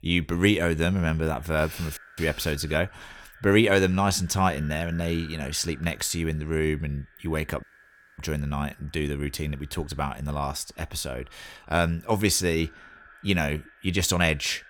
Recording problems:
echo of what is said; faint; throughout; 290 ms later, 25 dB below the speech
audio cutting out; at 2 s and at 7.5 s for 0.5 s

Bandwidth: 17 kHz